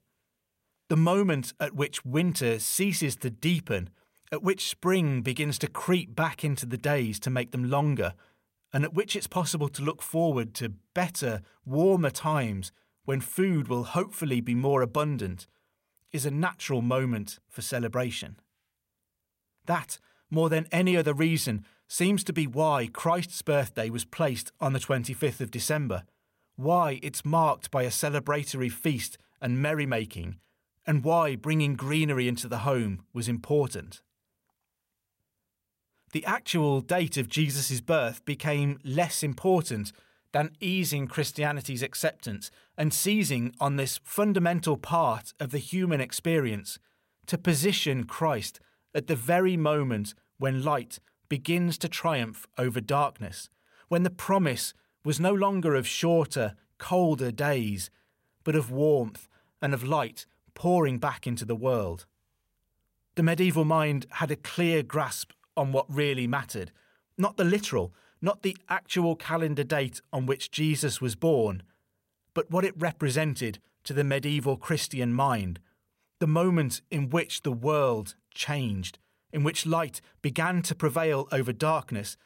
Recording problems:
none

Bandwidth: 16 kHz